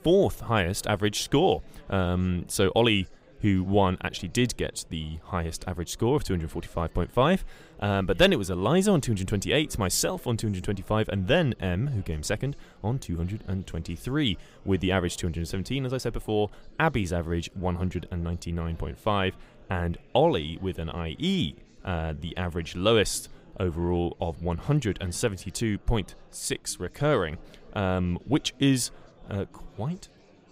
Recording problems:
chatter from many people; faint; throughout; 25 dB below the speech

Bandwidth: 15.5 kHz